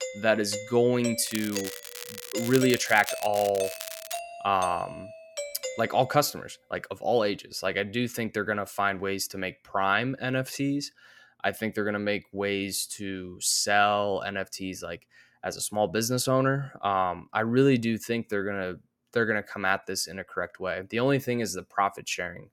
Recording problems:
crackling; loud; from 1.5 to 4 s; 10 dB below the speech
doorbell; noticeable; until 6 s; peak 7 dB below the speech

